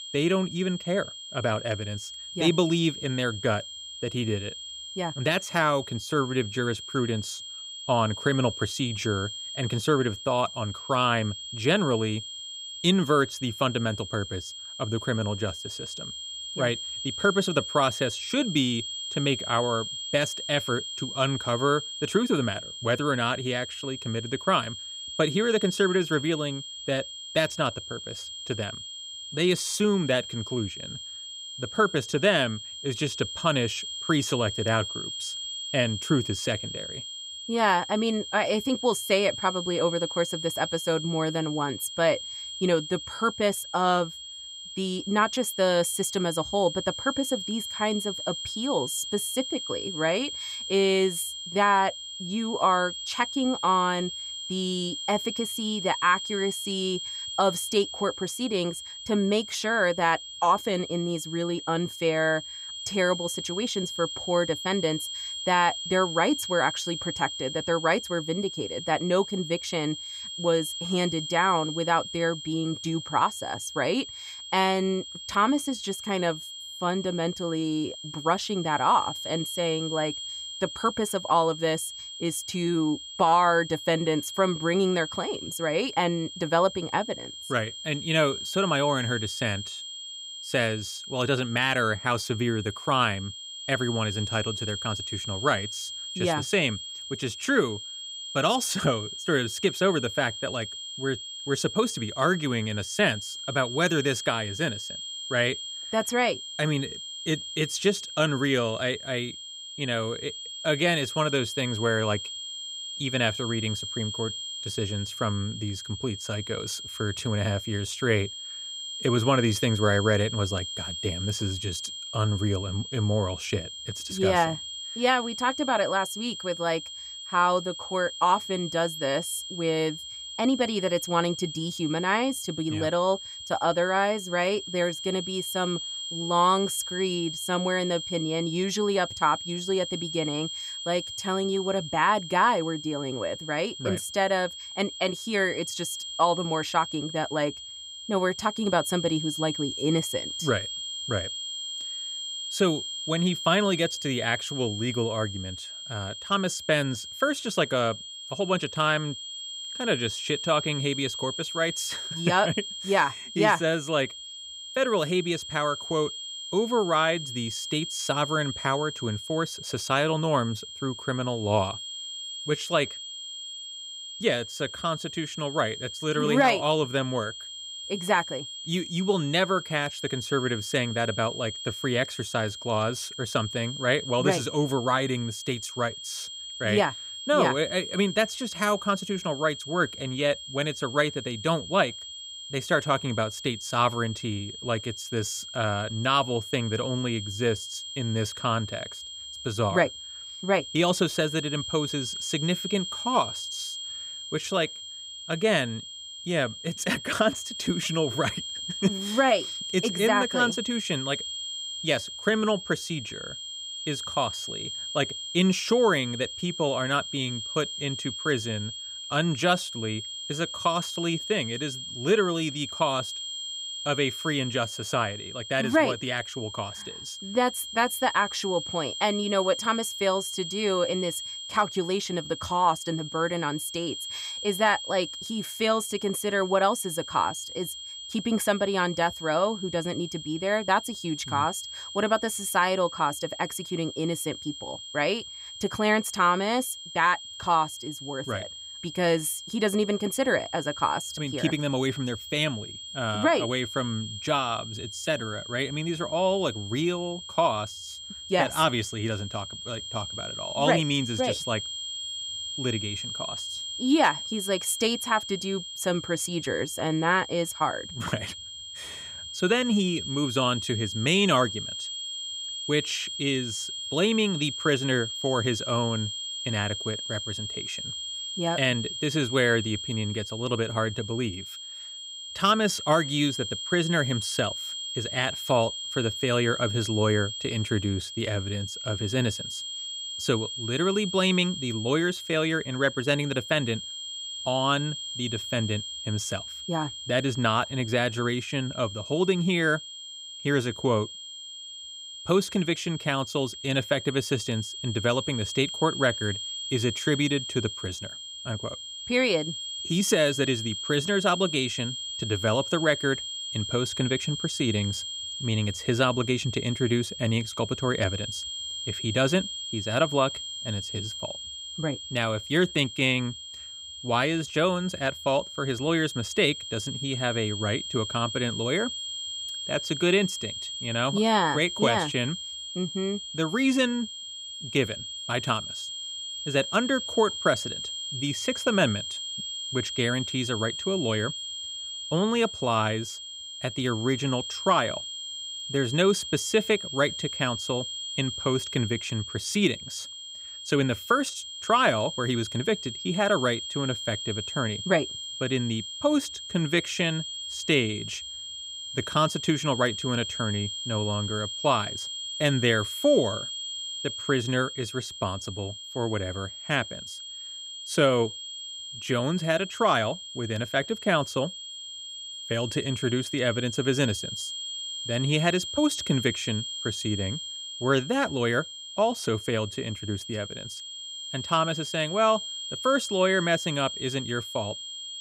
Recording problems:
high-pitched whine; loud; throughout; 3 kHz, 7 dB below the speech

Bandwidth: 15.5 kHz